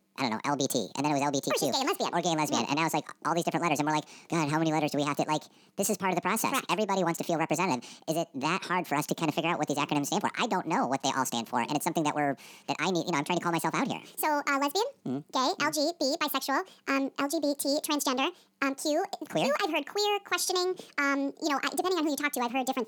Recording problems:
wrong speed and pitch; too fast and too high; 1.6 times normal speed

